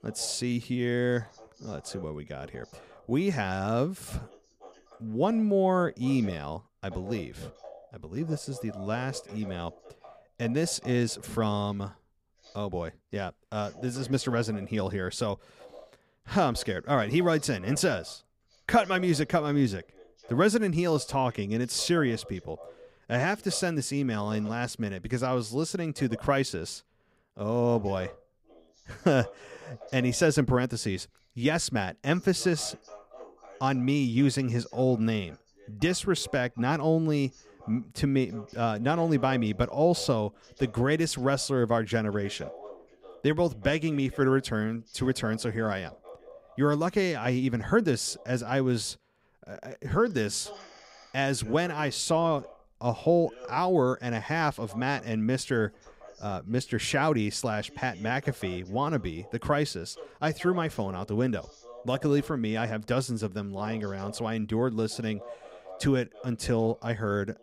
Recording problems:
voice in the background; faint; throughout; 20 dB below the speech

